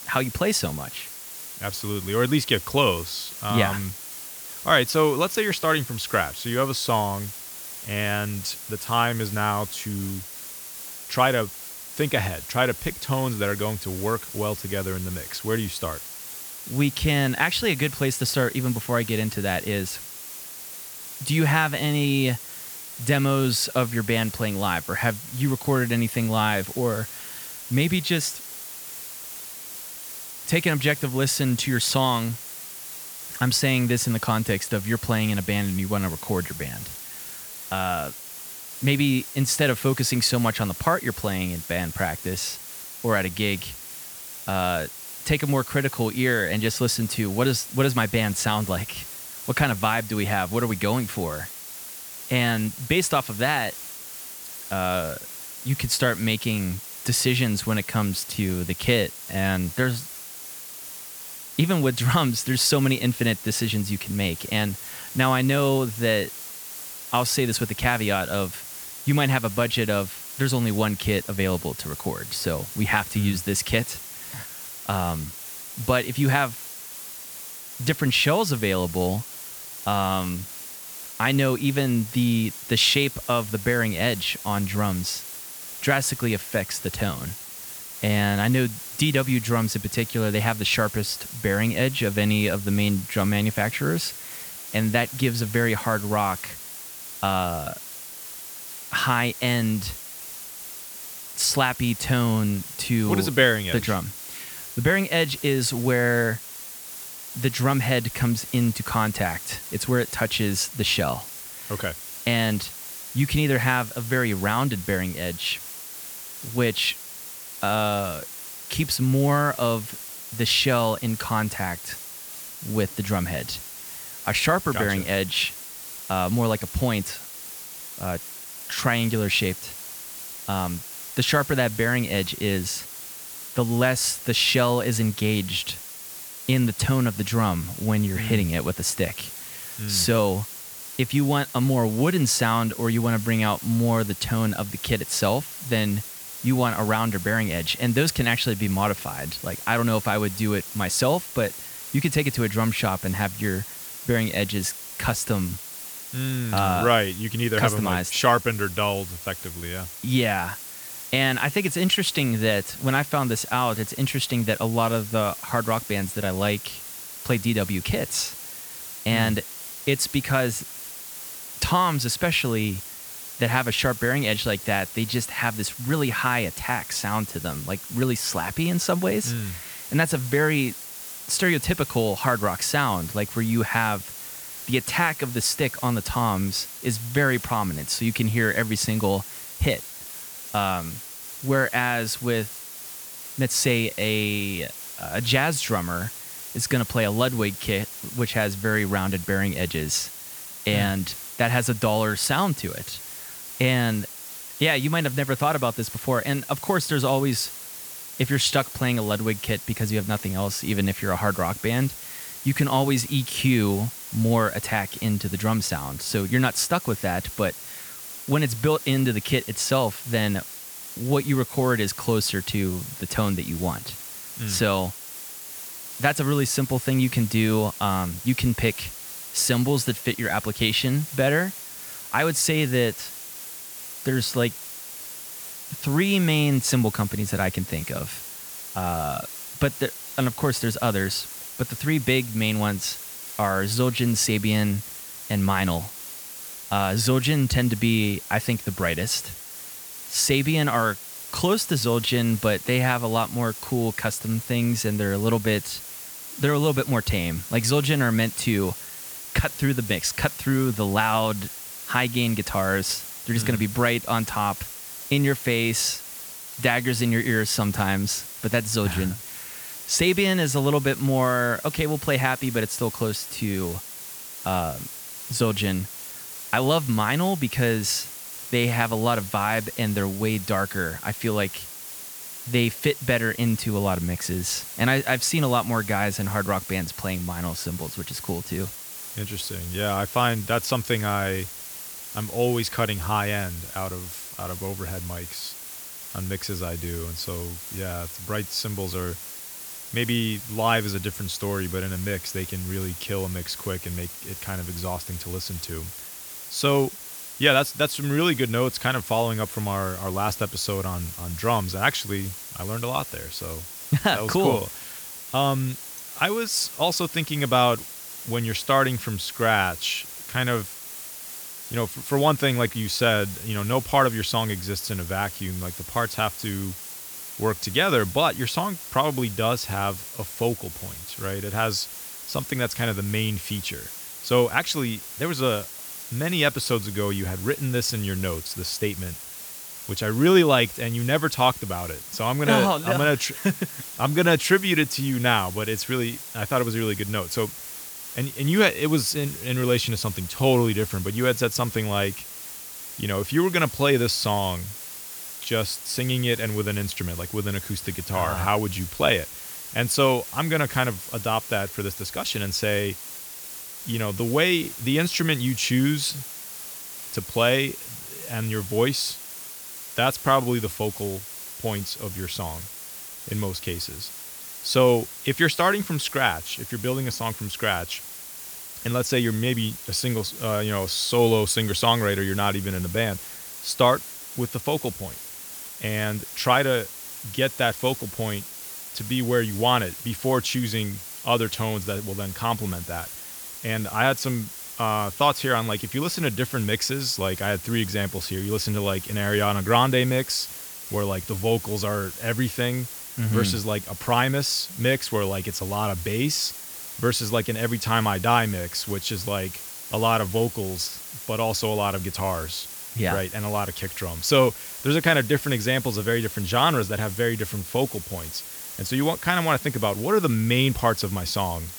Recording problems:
hiss; noticeable; throughout; 10 dB below the speech

